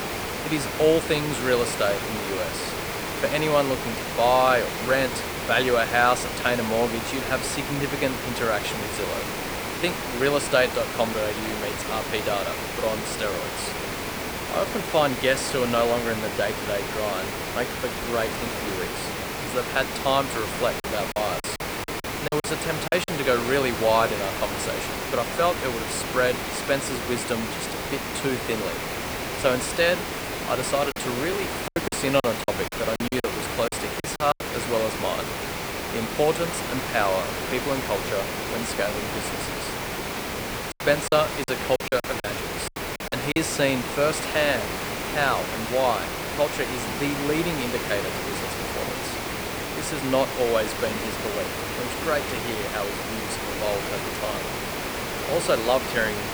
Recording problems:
hiss; loud; throughout; 3 dB below the speech
choppy; very; from 21 to 23 s, from 31 to 34 s and from 41 to 43 s; 18% of the speech affected

